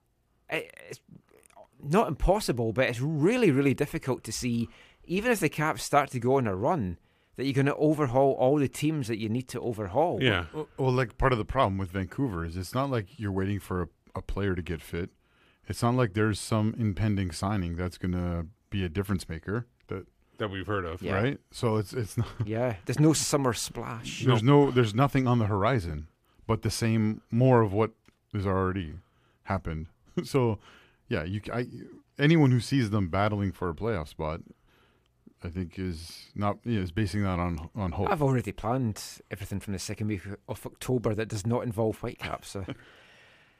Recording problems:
none

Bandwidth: 15 kHz